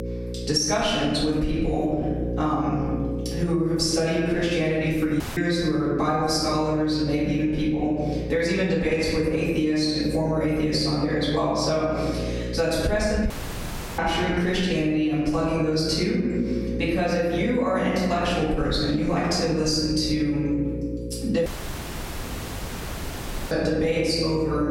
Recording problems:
off-mic speech; far
room echo; noticeable; dies away in 1.3 s
squashed, flat; somewhat
electrical hum; noticeable; throughout; 60 Hz, 15 dB below the speech
audio cutting out; at 5 s, at 13 s for 0.5 s and at 21 s for 2 s

